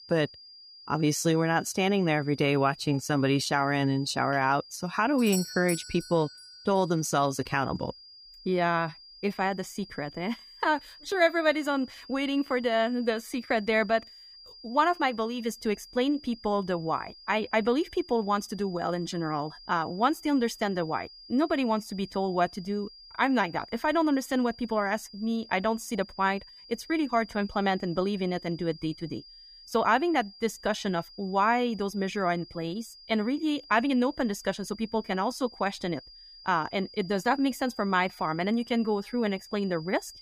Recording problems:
high-pitched whine; noticeable; throughout; 5 kHz, 20 dB below the speech
doorbell; noticeable; at 5 s; peak 6 dB below the speech

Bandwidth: 15 kHz